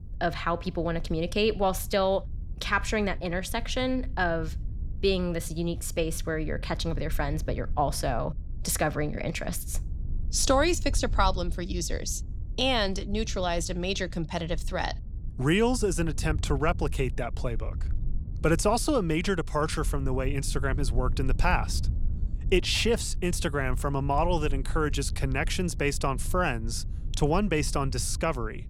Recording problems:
low rumble; faint; throughout; 25 dB below the speech

